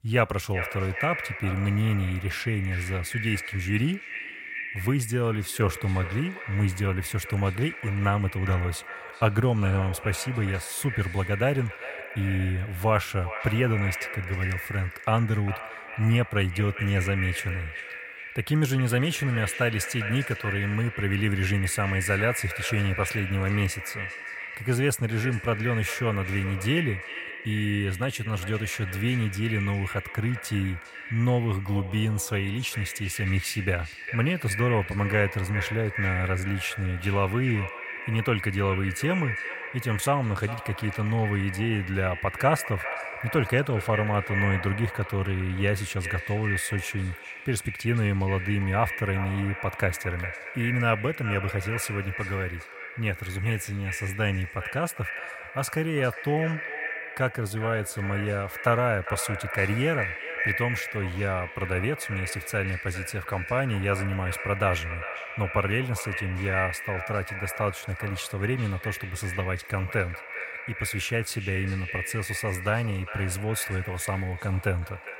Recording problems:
echo of what is said; strong; throughout; 400 ms later, 7 dB below the speech

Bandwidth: 16 kHz